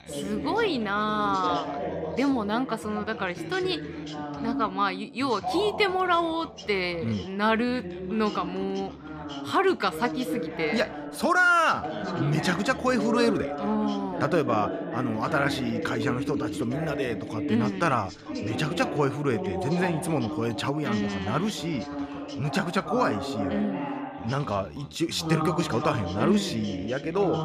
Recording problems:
background chatter; loud; throughout; 2 voices, 6 dB below the speech

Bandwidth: 14.5 kHz